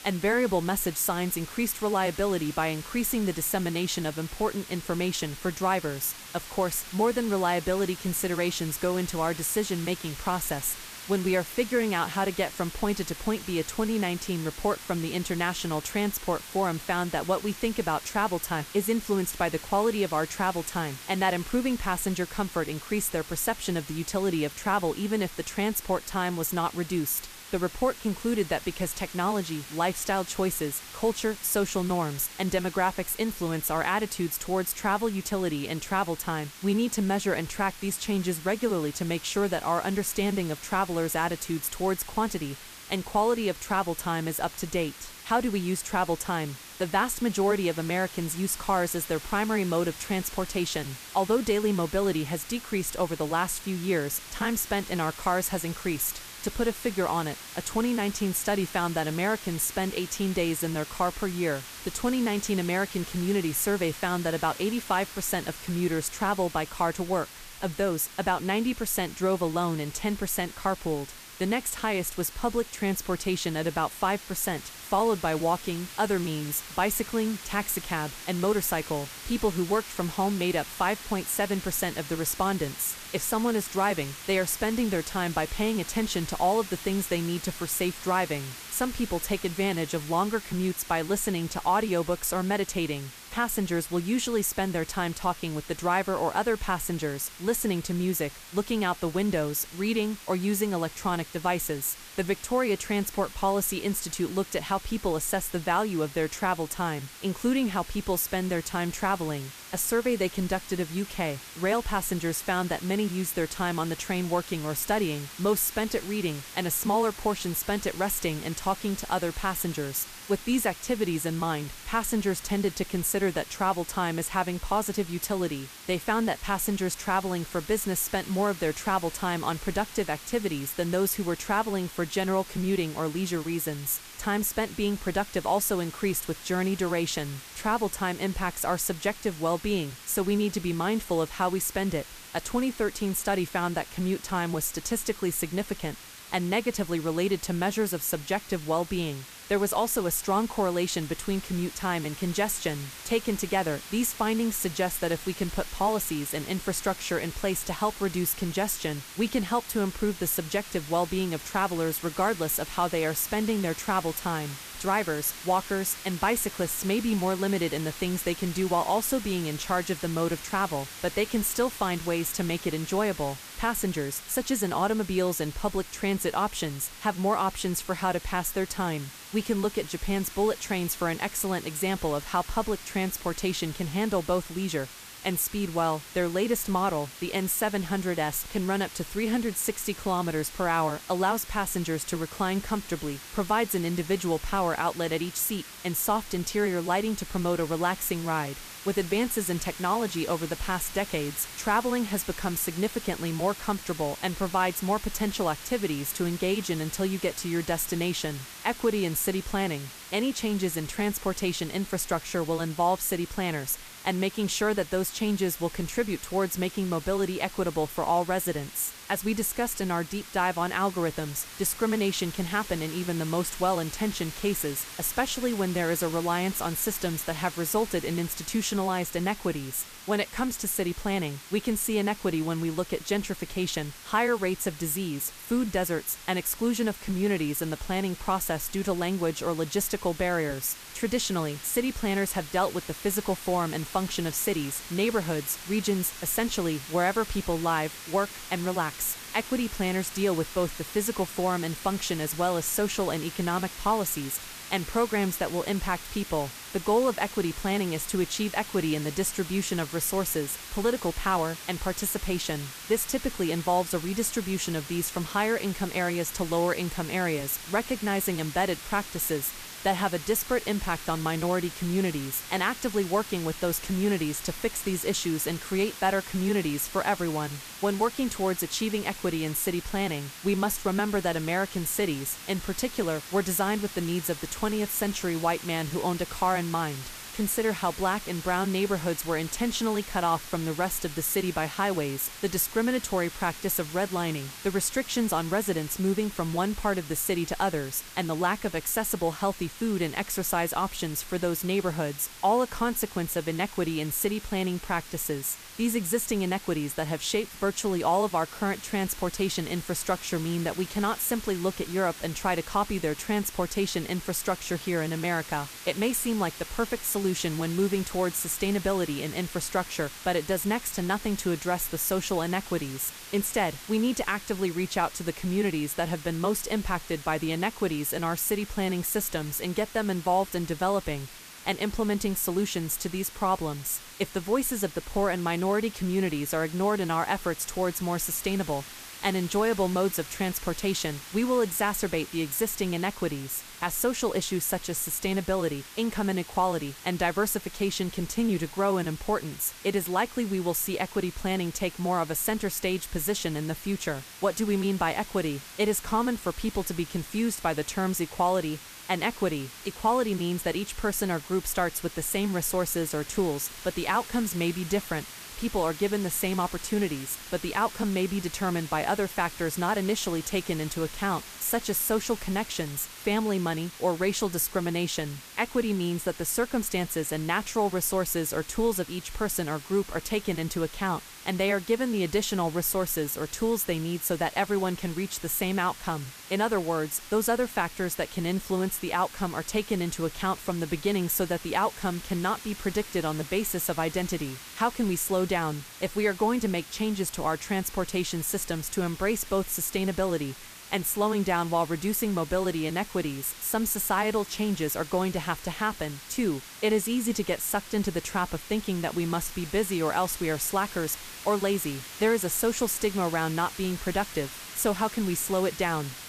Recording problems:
hiss; noticeable; throughout; 15 dB below the speech

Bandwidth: 14.5 kHz